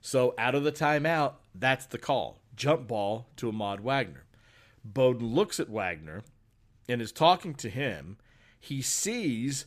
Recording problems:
none

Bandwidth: 14.5 kHz